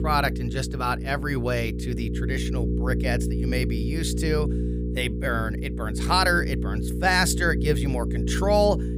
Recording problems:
electrical hum; noticeable; throughout; 60 Hz, 10 dB below the speech

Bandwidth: 15.5 kHz